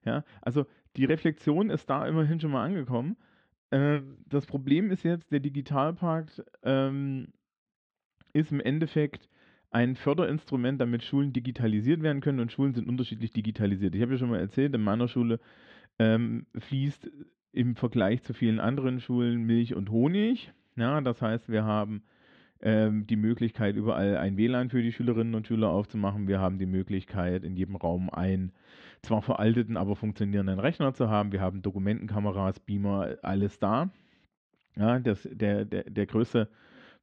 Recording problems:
muffled; slightly; fading above 3.5 kHz

